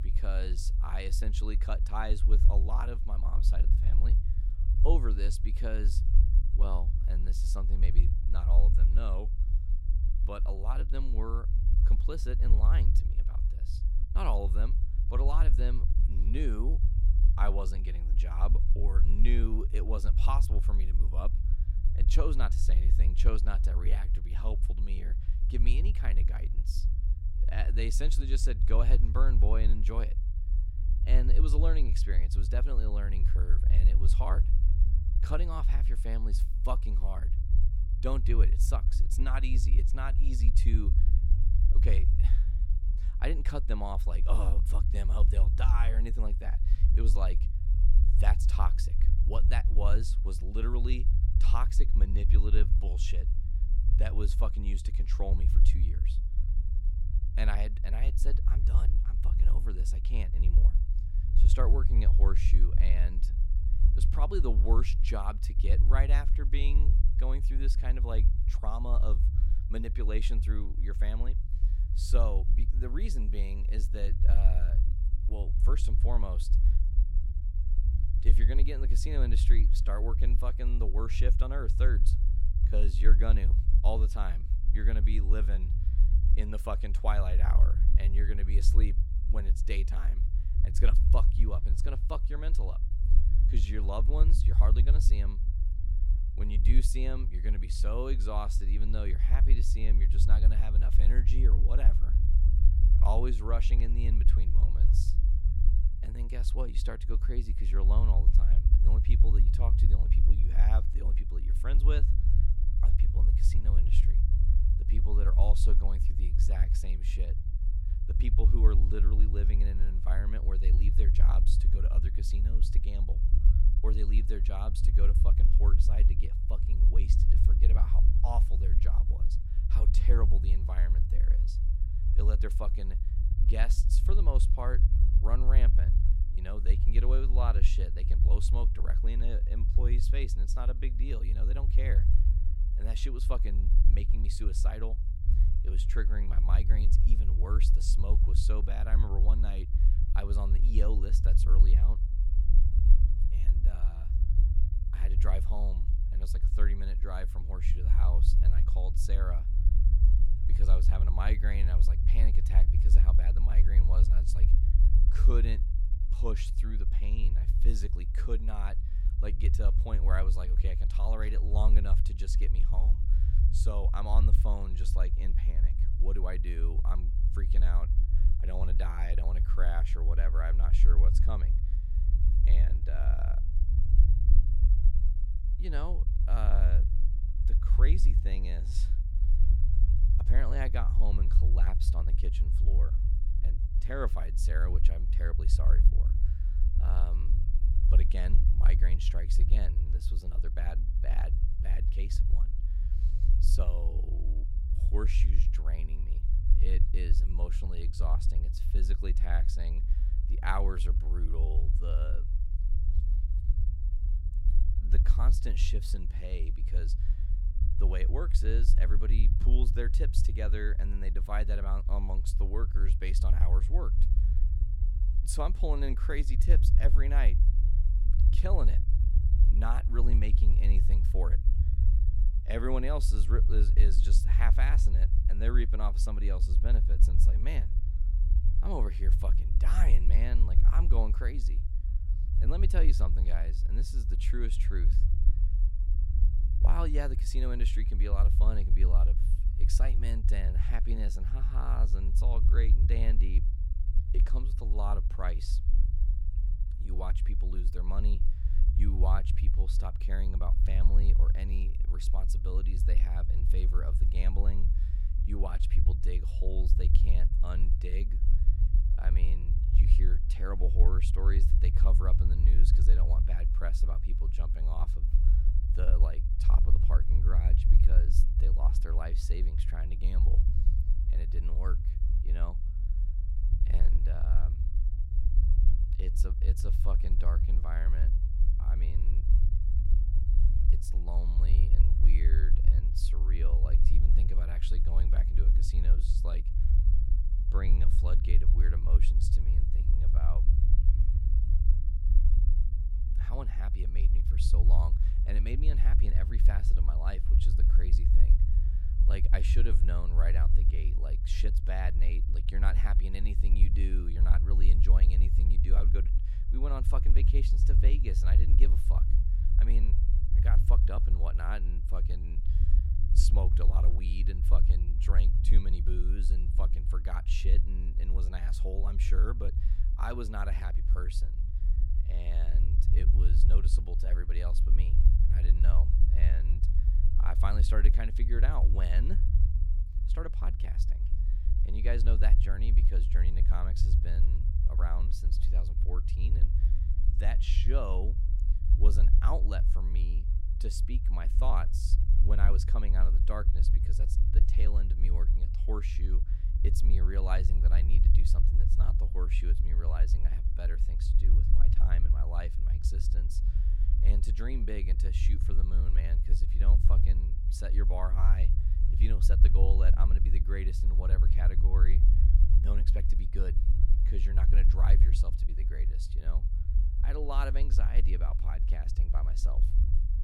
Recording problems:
low rumble; loud; throughout; 7 dB below the speech

